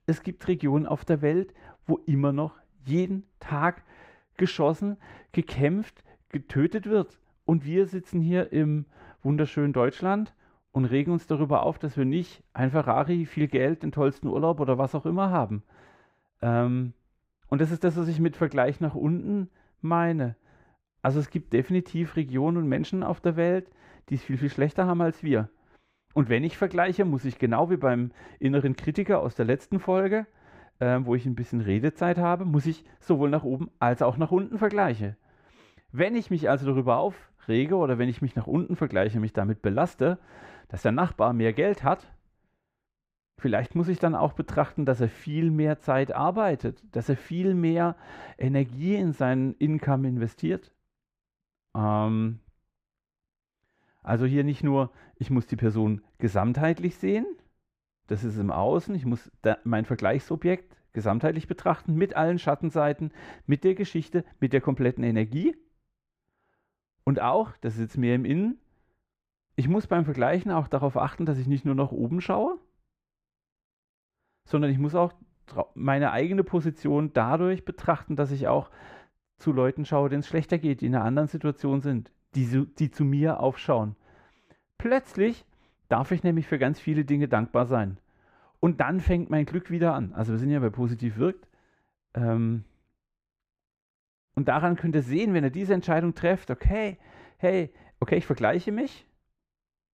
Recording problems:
muffled; very; fading above 3.5 kHz

